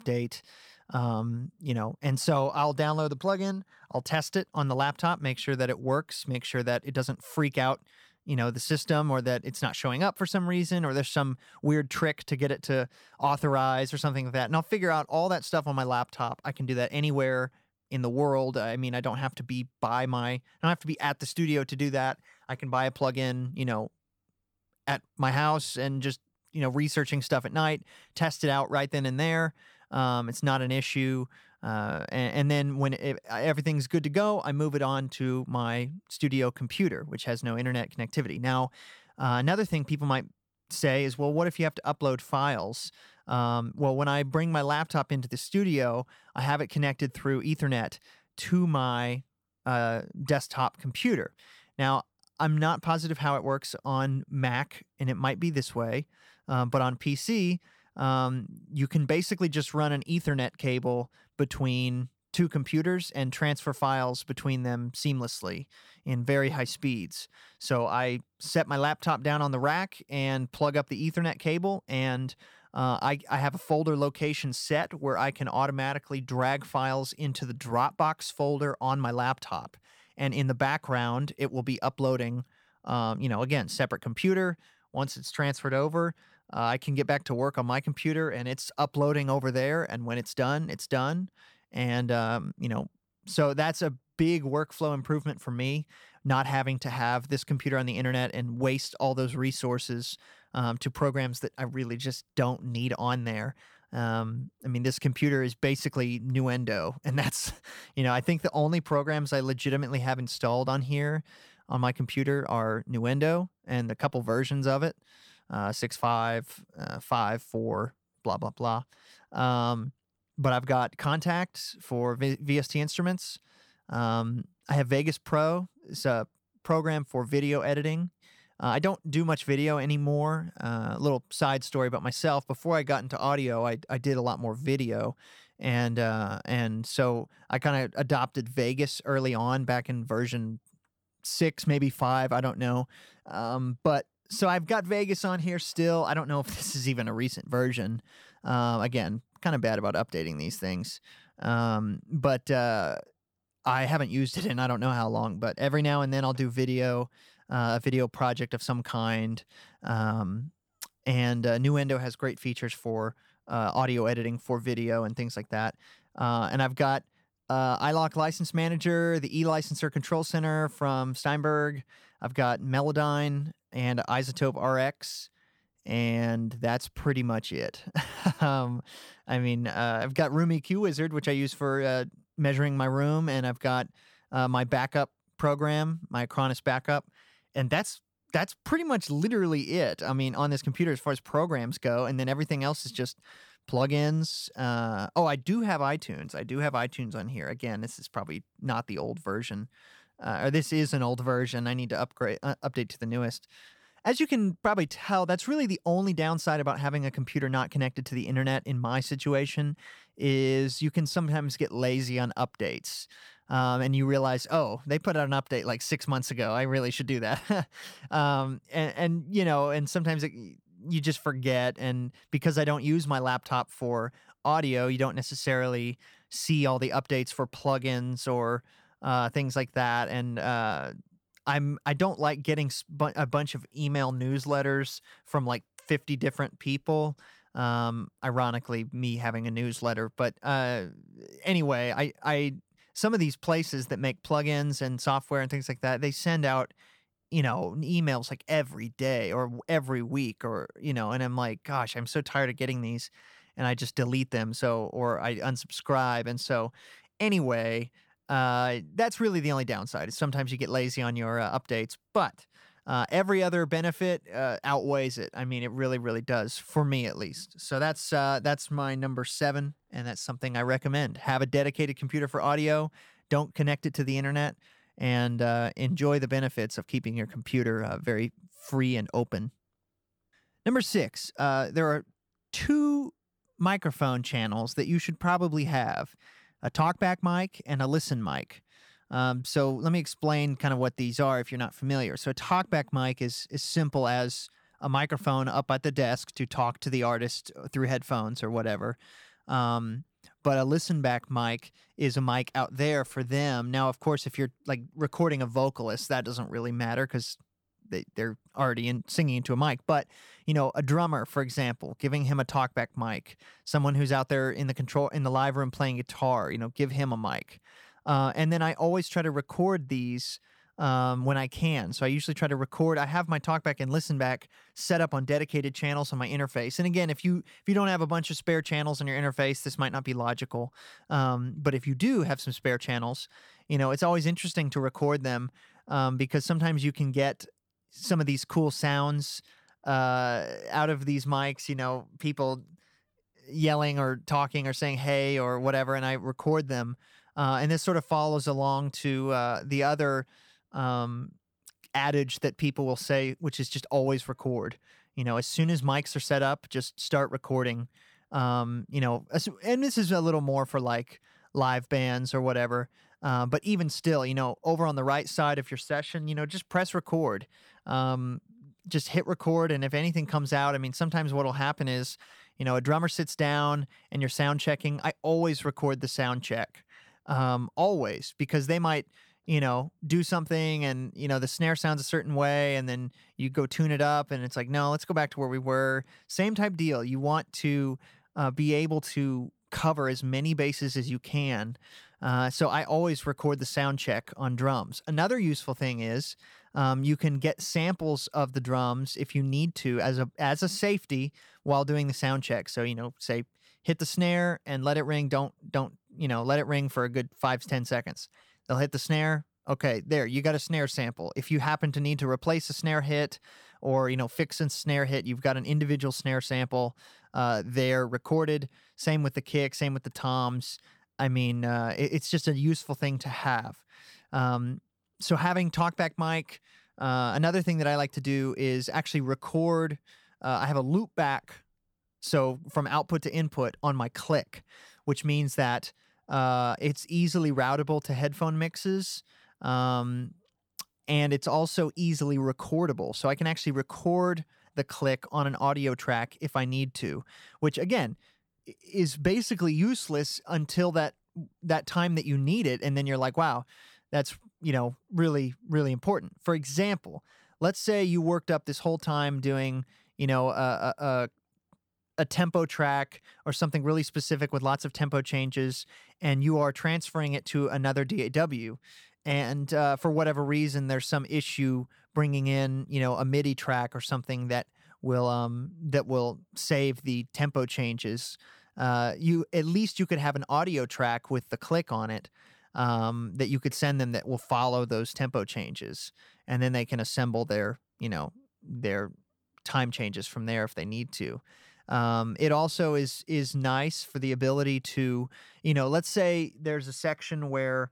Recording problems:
none

